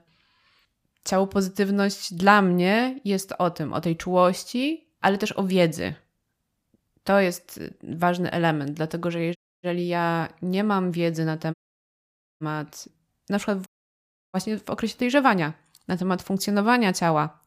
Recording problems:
audio cutting out; at 9.5 s, at 12 s for 1 s and at 14 s for 0.5 s

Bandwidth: 15 kHz